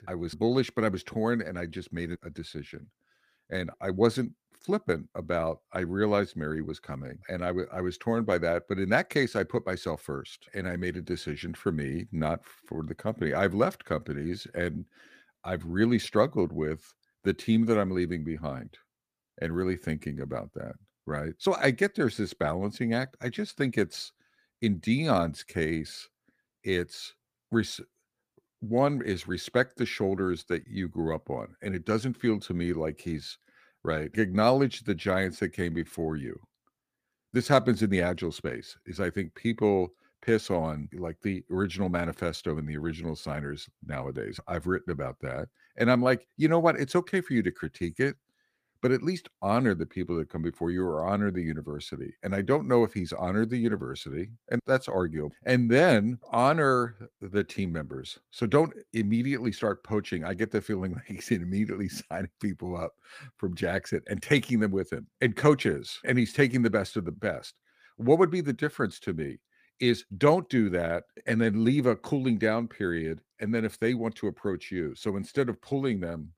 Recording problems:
none

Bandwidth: 15 kHz